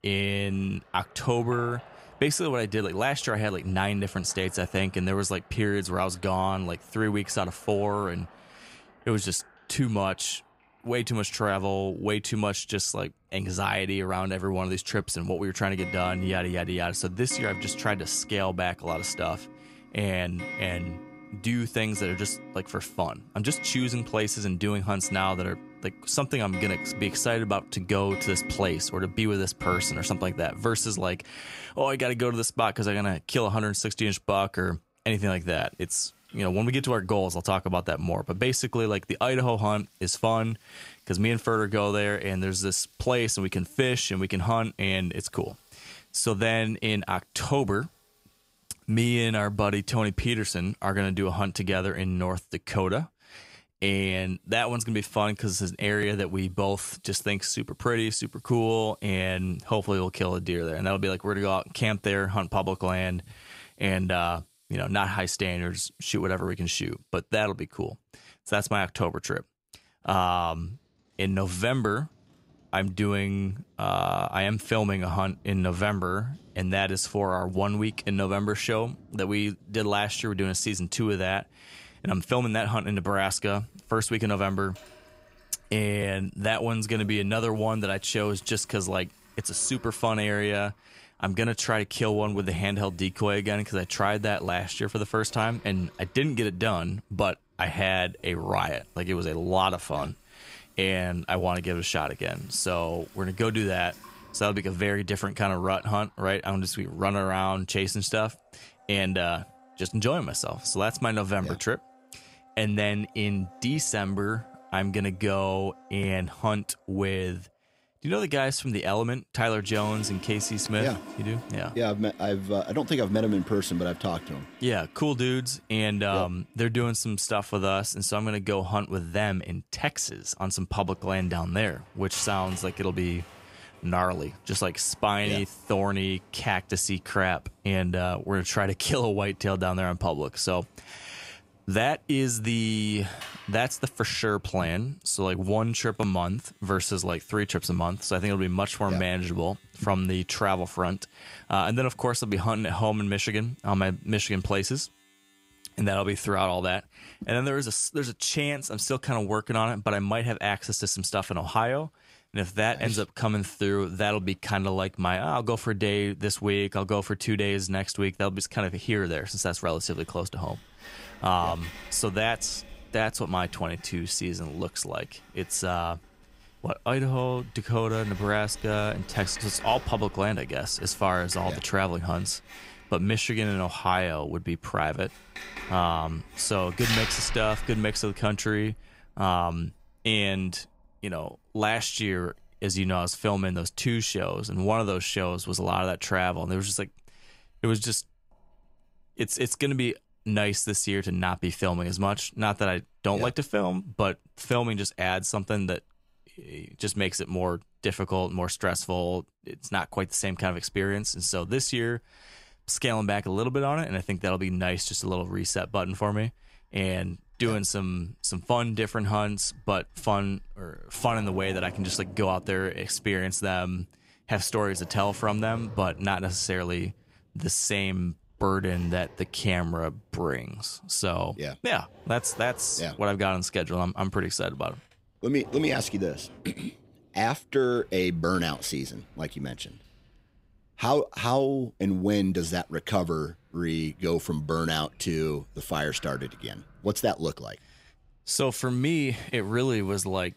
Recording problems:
household noises; noticeable; throughout; 15 dB below the speech

